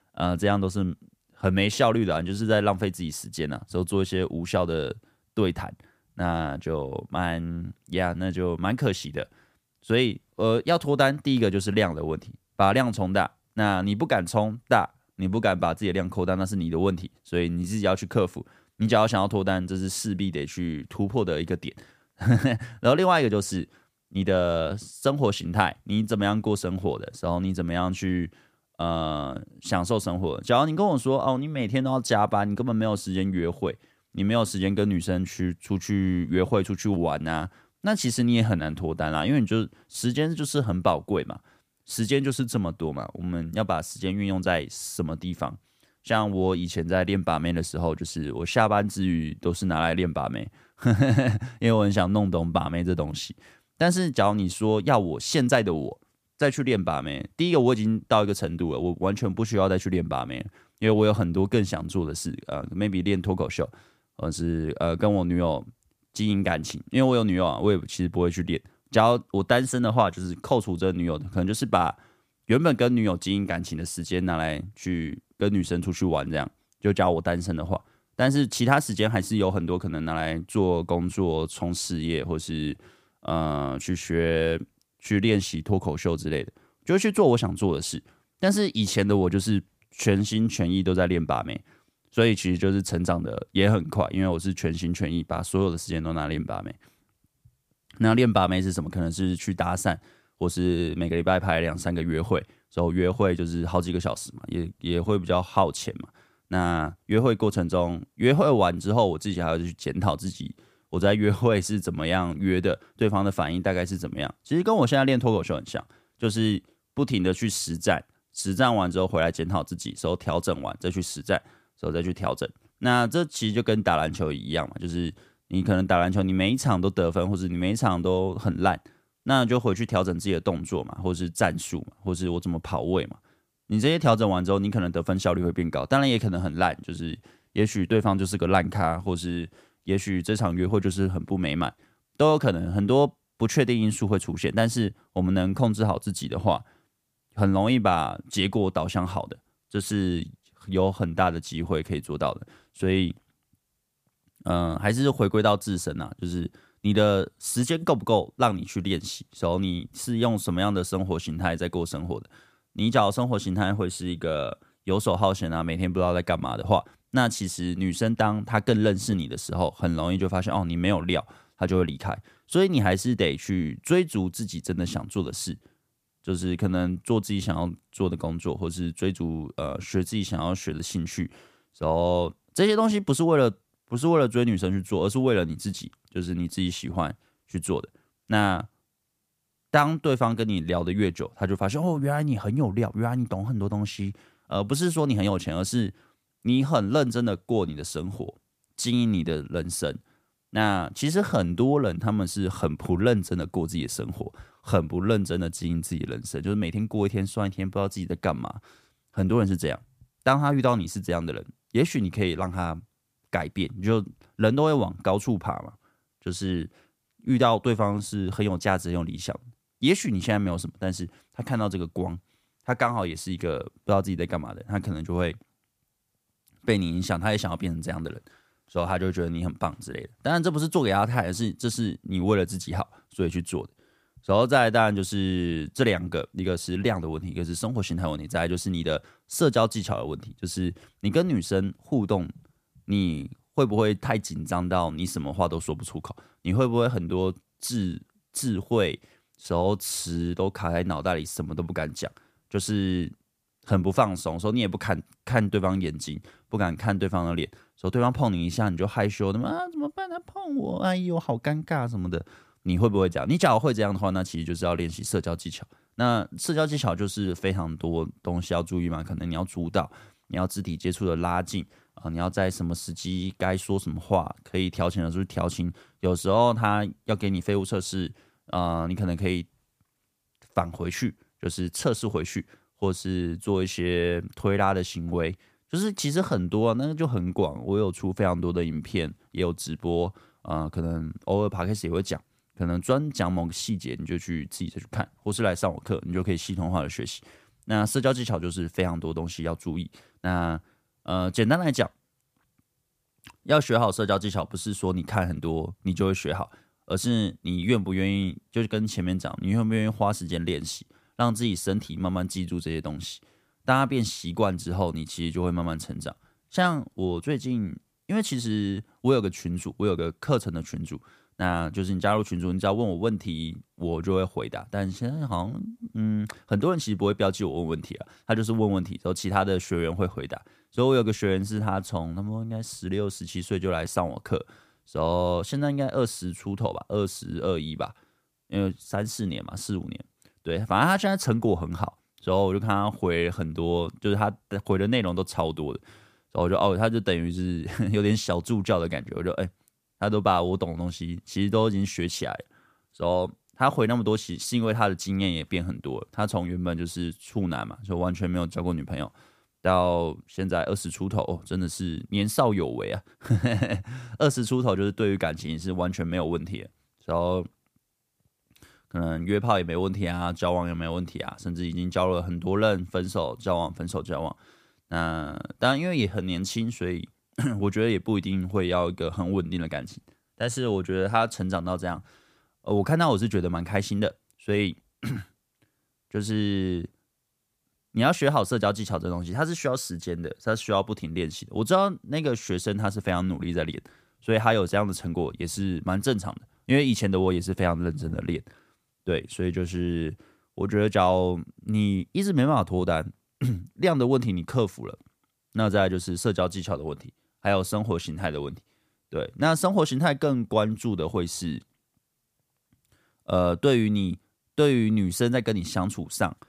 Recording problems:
none

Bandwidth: 15 kHz